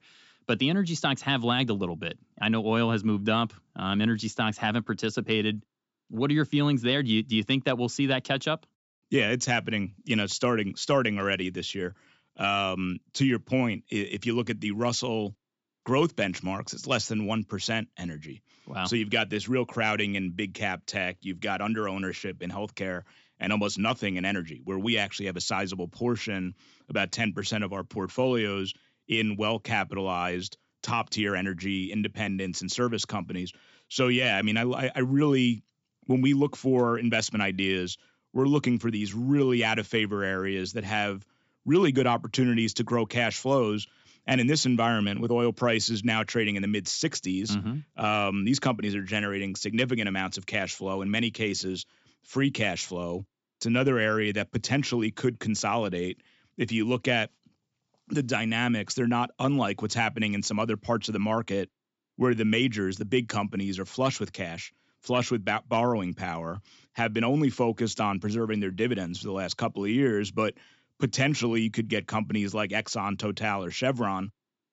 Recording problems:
high frequencies cut off; noticeable; nothing above 8 kHz

